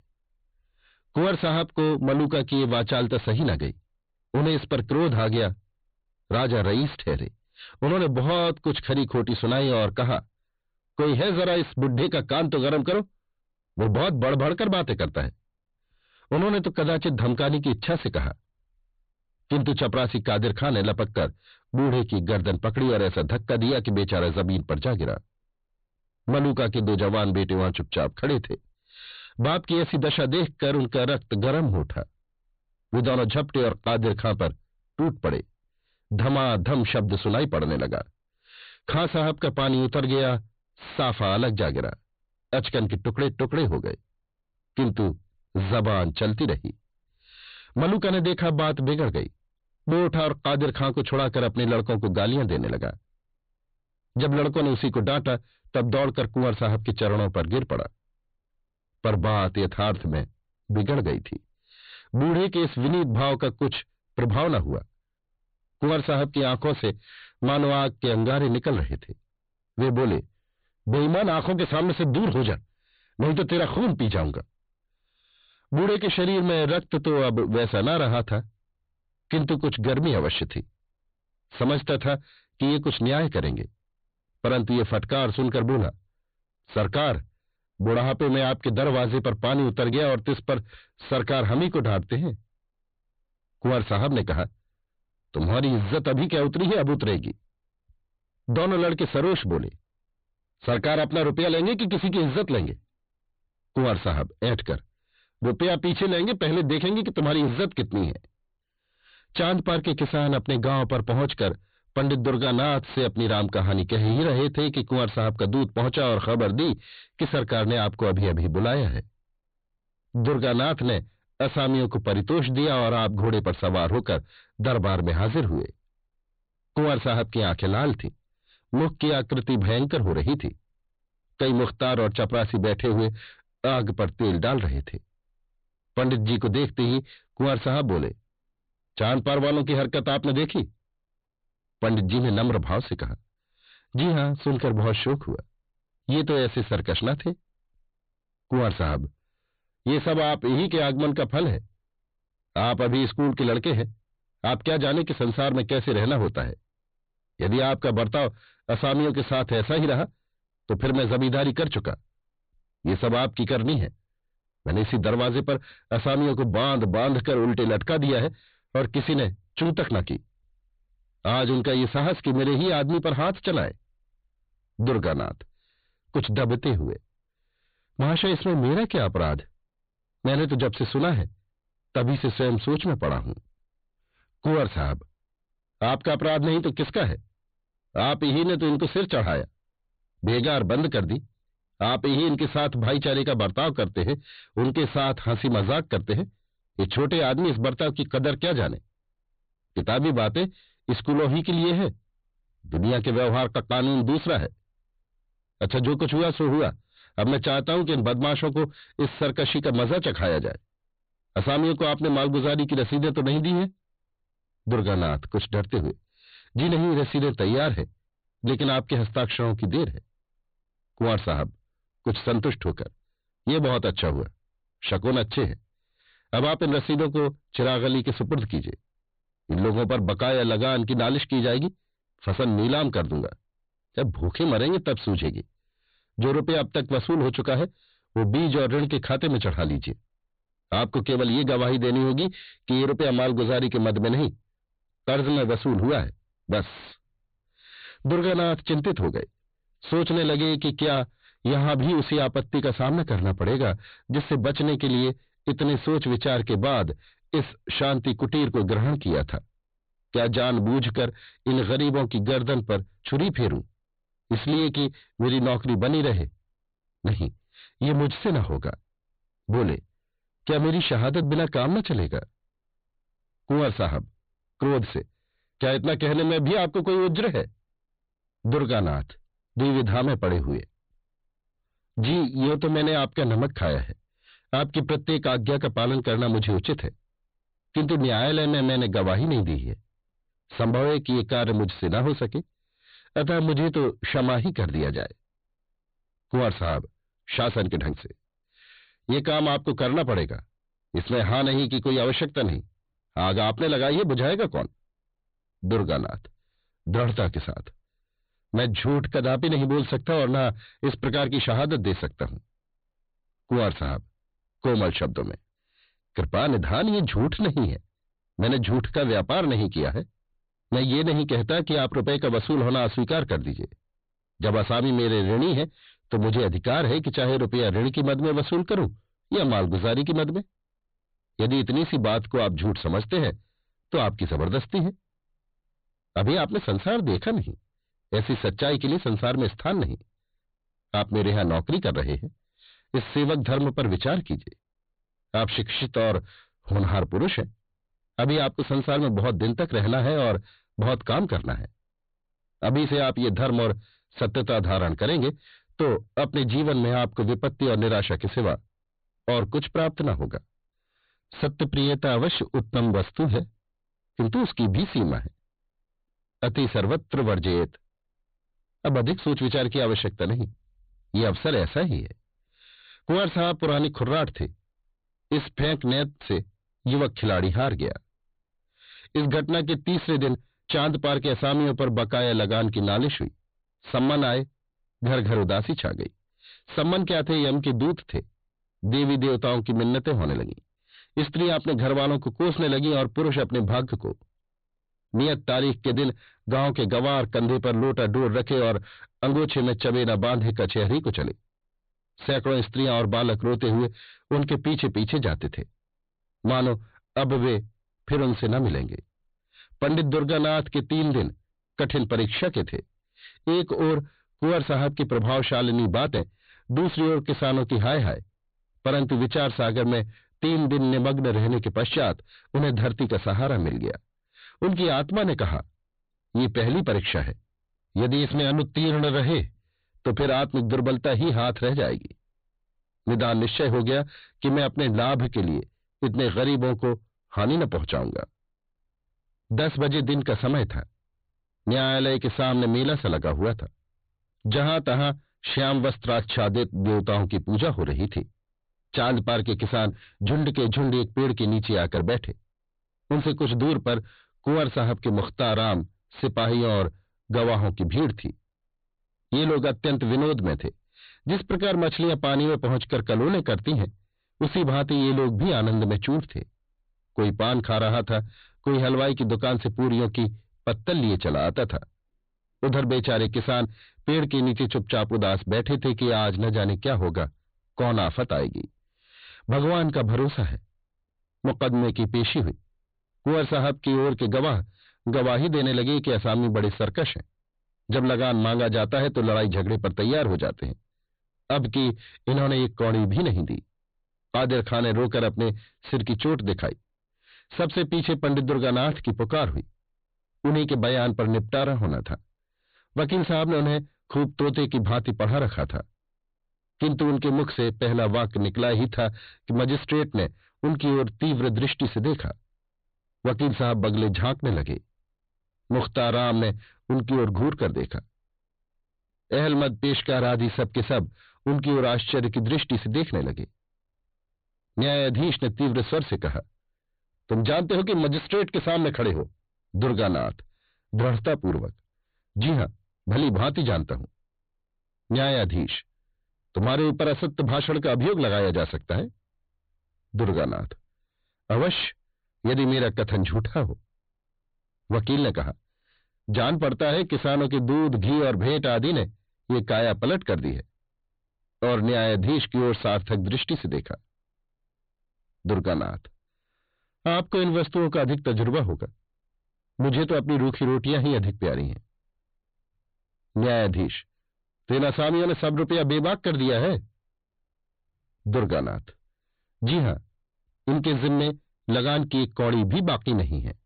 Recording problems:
distortion; heavy; 7 dB below the speech
high frequencies cut off; severe; nothing above 4.5 kHz

